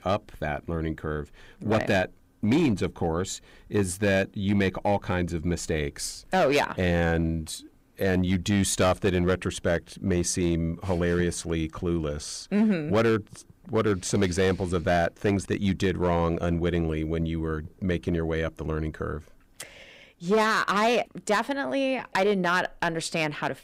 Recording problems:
distortion; slight; 4% of the sound clipped

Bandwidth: 15.5 kHz